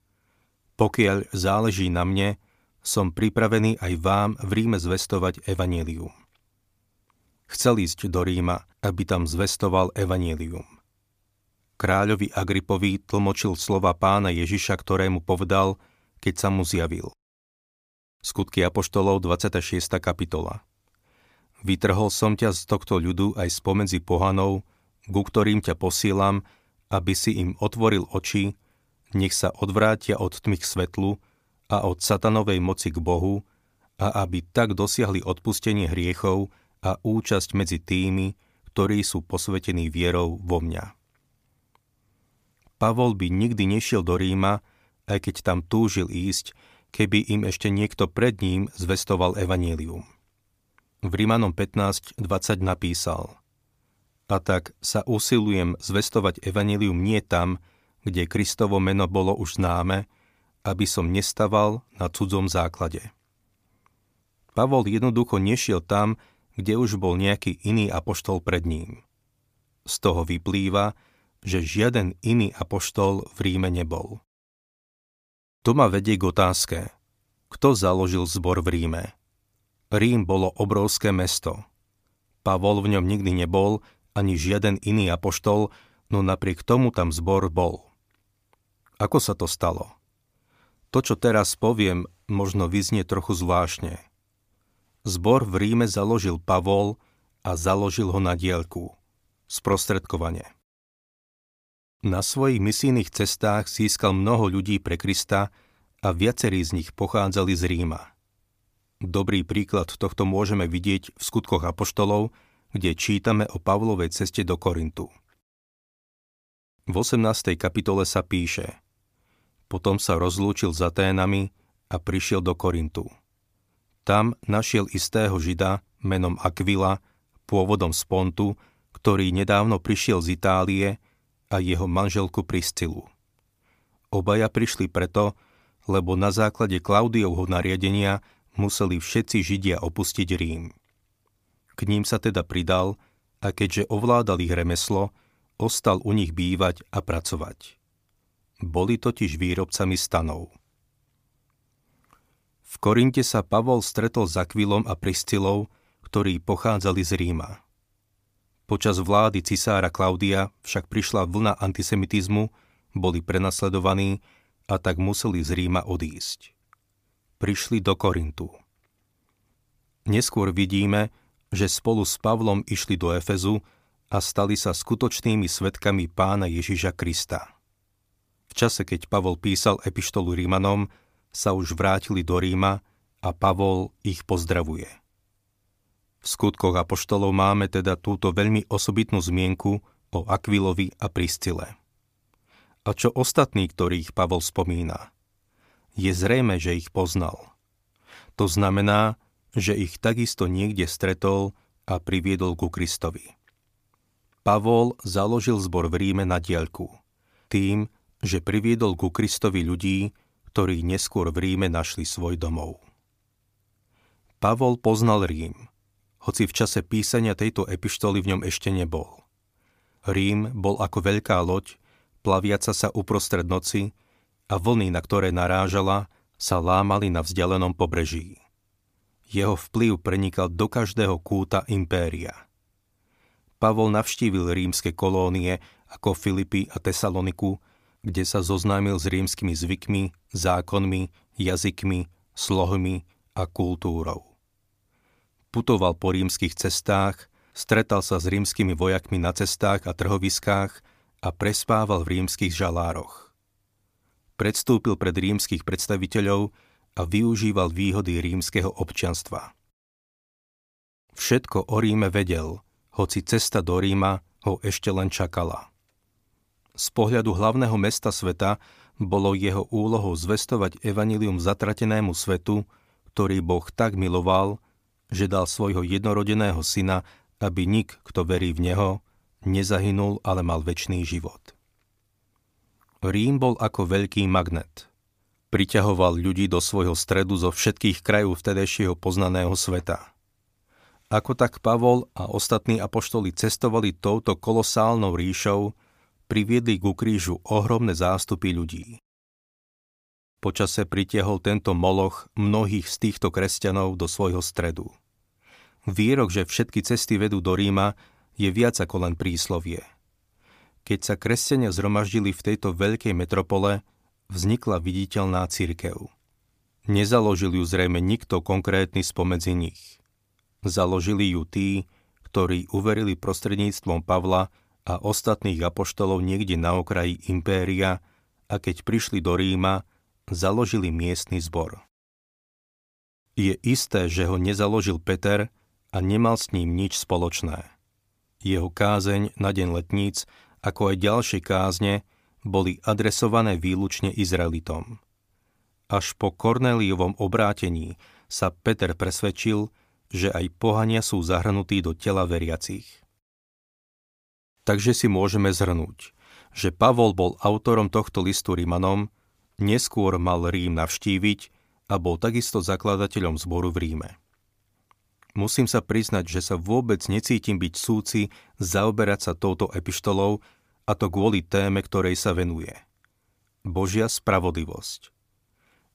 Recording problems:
none

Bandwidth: 15 kHz